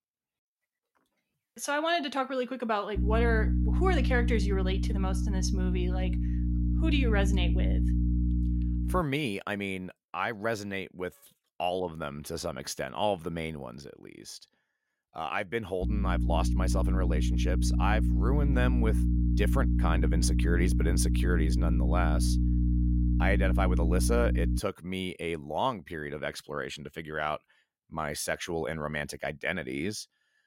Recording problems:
electrical hum; loud; from 3 to 9 s and from 16 to 25 s; 60 Hz, 7 dB below the speech

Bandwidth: 16 kHz